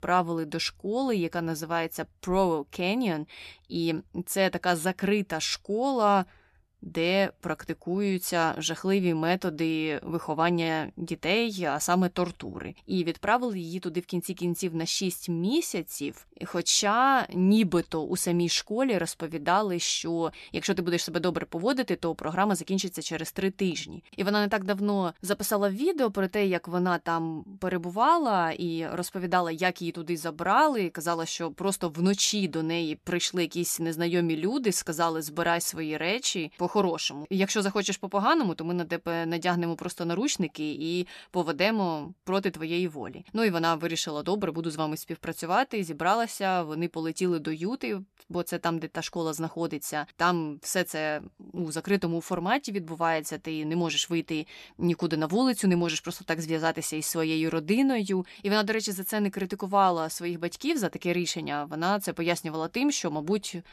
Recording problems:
none

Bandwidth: 13.5 kHz